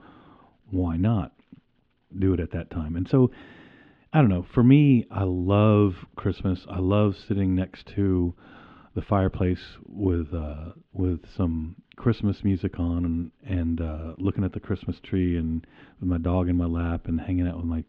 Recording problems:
muffled; slightly; fading above 3.5 kHz

